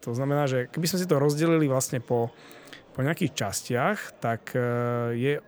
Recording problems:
murmuring crowd; faint; throughout; 25 dB below the speech

